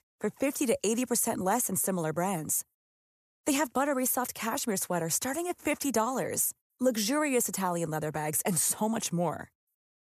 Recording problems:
none

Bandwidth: 14.5 kHz